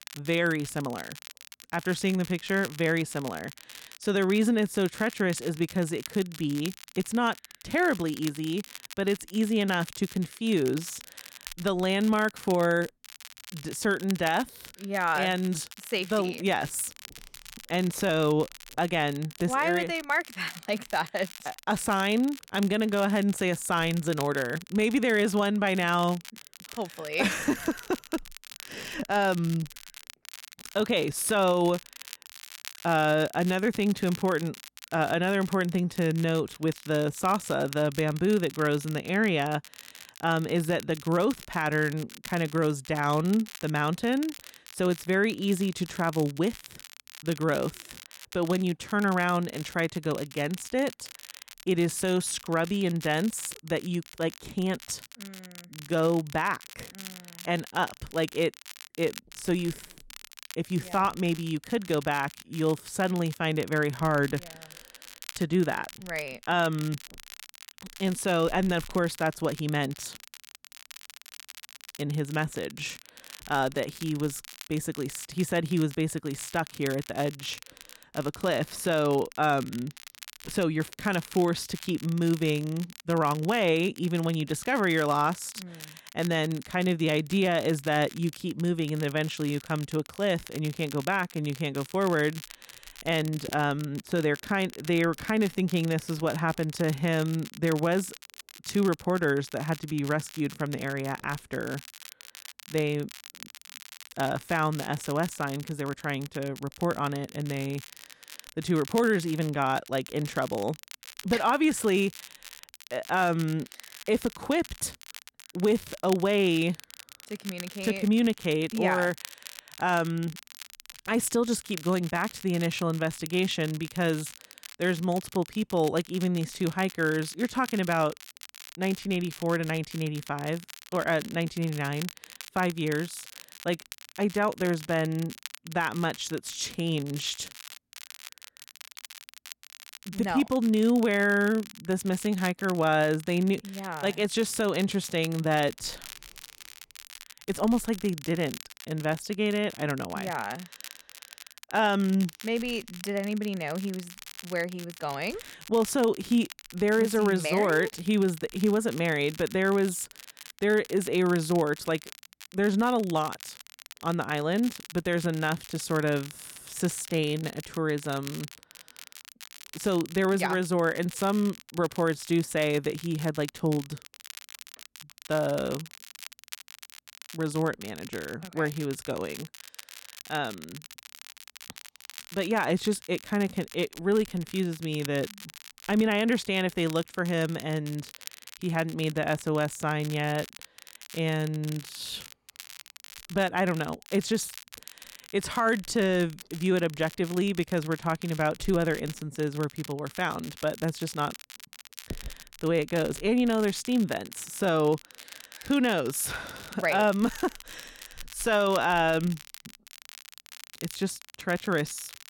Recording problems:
crackle, like an old record; noticeable; 15 dB below the speech

